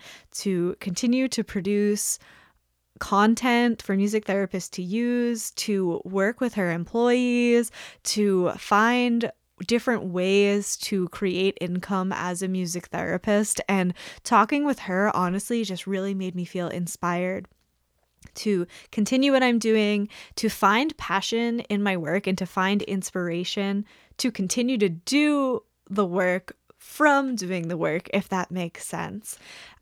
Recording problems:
none

